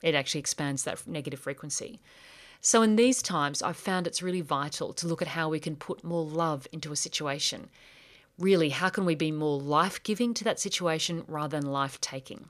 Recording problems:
none

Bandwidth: 14.5 kHz